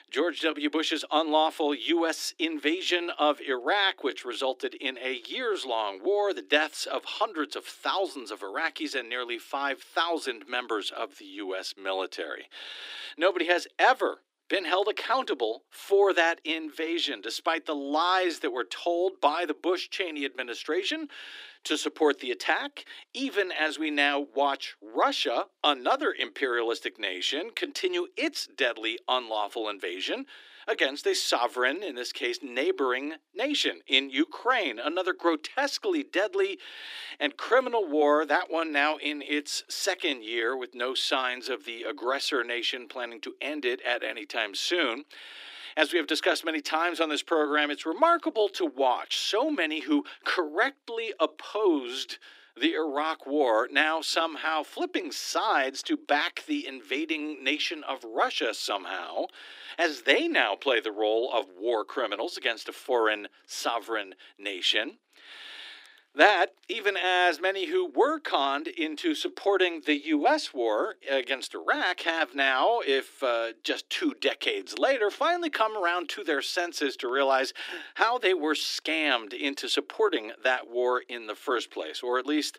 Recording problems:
thin; somewhat; fading below 300 Hz

